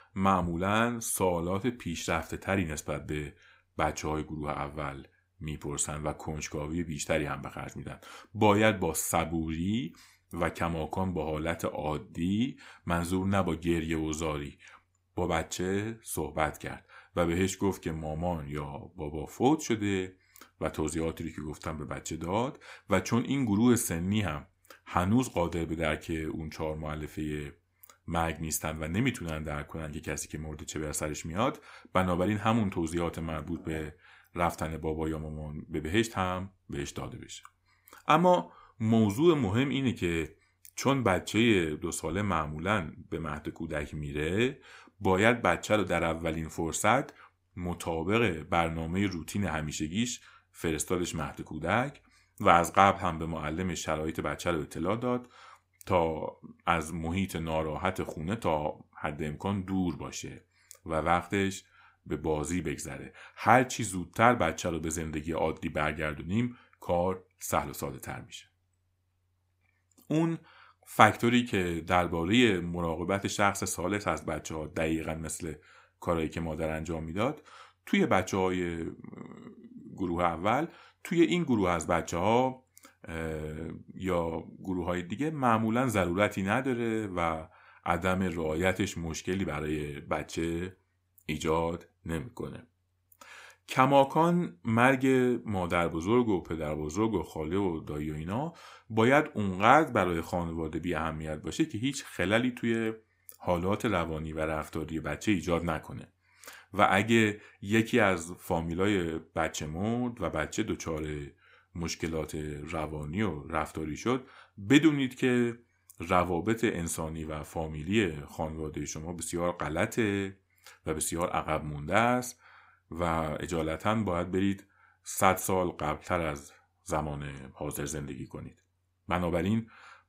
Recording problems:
none

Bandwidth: 15.5 kHz